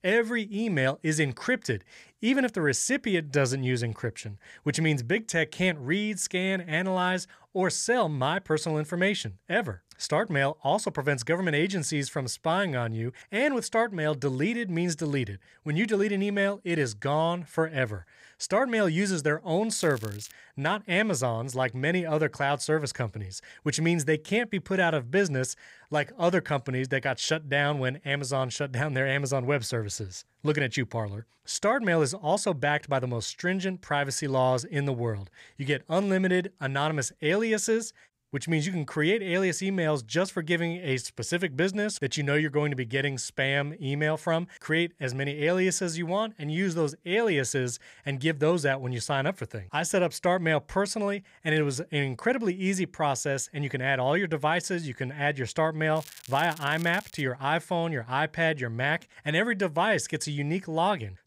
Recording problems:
crackling; noticeable; at 20 s and from 56 to 57 s; 20 dB below the speech

